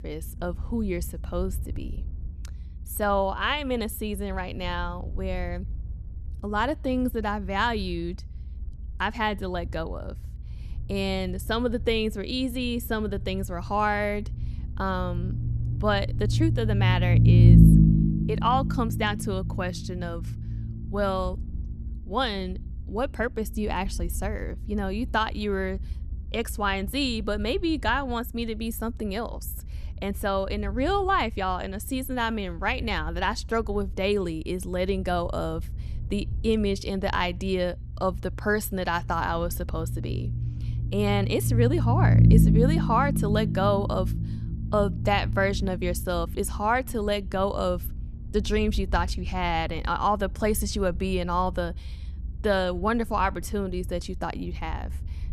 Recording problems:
low rumble; loud; throughout; 8 dB below the speech

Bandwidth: 13.5 kHz